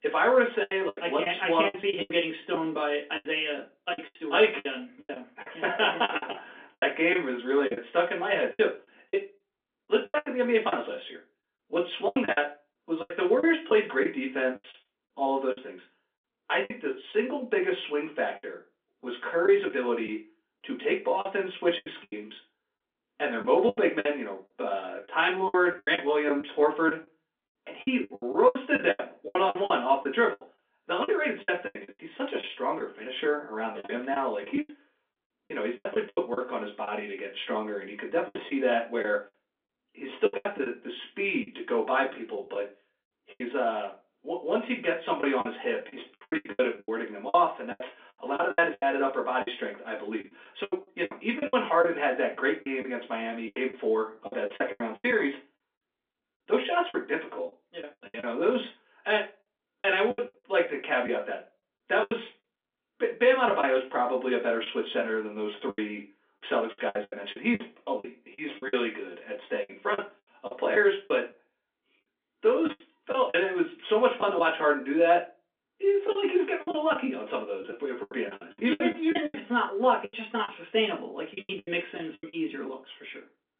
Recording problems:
off-mic speech; far
phone-call audio; nothing above 3.5 kHz
room echo; very slight; dies away in 0.2 s
choppy; very; 13% of the speech affected

